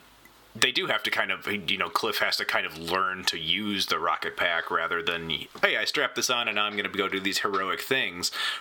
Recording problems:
thin; somewhat; fading below 900 Hz
squashed, flat; somewhat

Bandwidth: 18 kHz